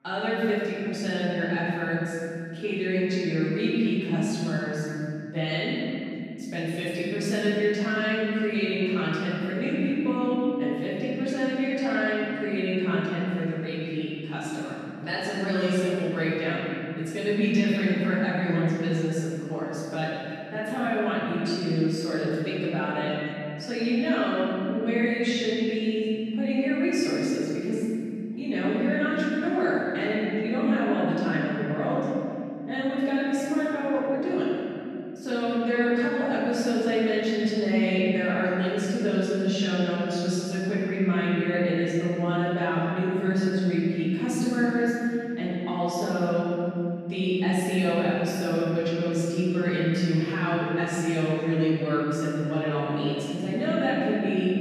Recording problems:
room echo; strong; dies away in 2.6 s
off-mic speech; far
voice in the background; faint; throughout; 25 dB below the speech

